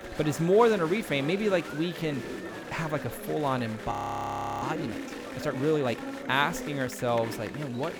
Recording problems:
chatter from many people; loud; throughout; 10 dB below the speech
audio freezing; at 4 s for 0.5 s

